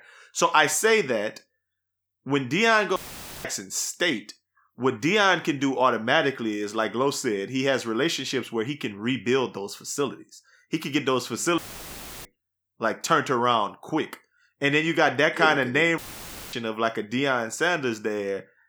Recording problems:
audio cutting out; filled with static; at 3 s, at 12 s for 0.5 s and at 16 s for 0.5 s

